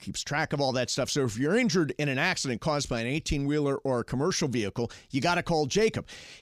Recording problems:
none

